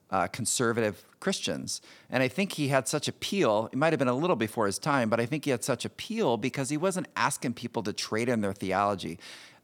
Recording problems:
none

